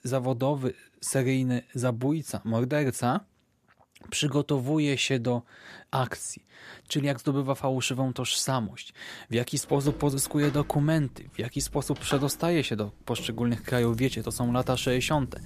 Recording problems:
household noises; noticeable; from 10 s on; 15 dB below the speech

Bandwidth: 14.5 kHz